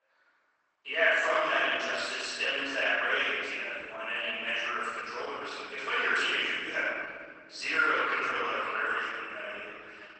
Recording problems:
room echo; strong; dies away in 2.1 s
off-mic speech; far
garbled, watery; badly; nothing above 8 kHz
thin; very; fading below 950 Hz
echo of what is said; noticeable; from 8 s on; 520 ms later, 10 dB below the speech

